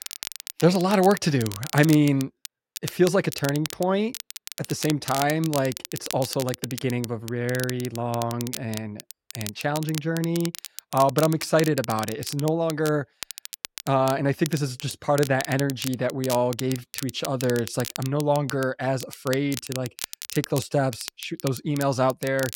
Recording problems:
crackle, like an old record; noticeable; 10 dB below the speech

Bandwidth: 16.5 kHz